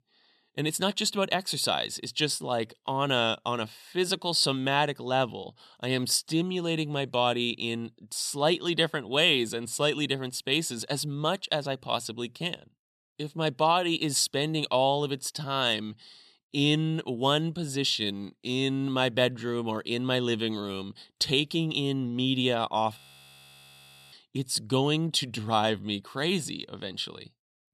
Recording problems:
audio freezing; at 23 s for 1 s

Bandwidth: 13.5 kHz